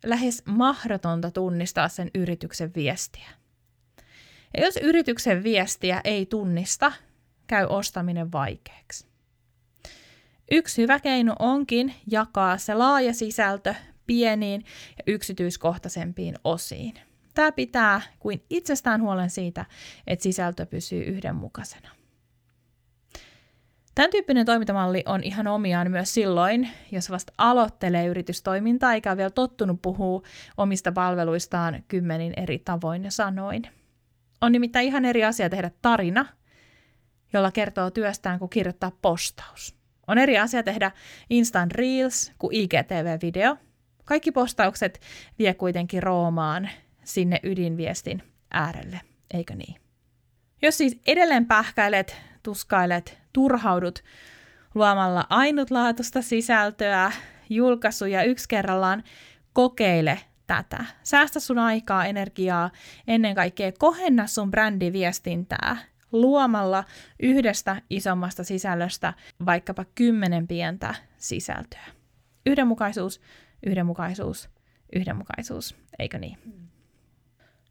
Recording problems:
none

